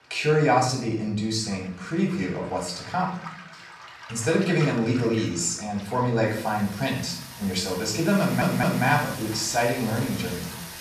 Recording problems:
off-mic speech; far
room echo; noticeable; dies away in 0.5 s
rain or running water; noticeable; throughout; 15 dB below the speech
audio stuttering; at 8 s

